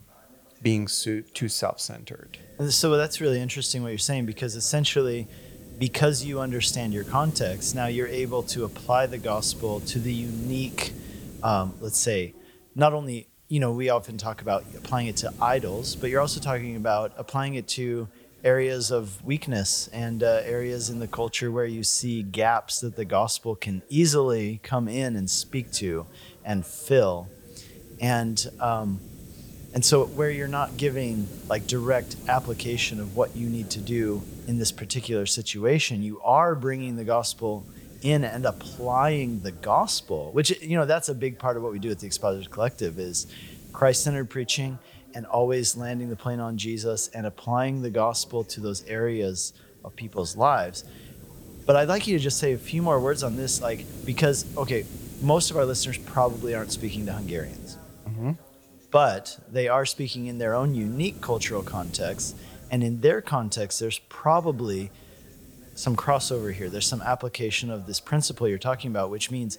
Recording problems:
hiss; noticeable; throughout; 15 dB below the speech
voice in the background; faint; throughout; 30 dB below the speech

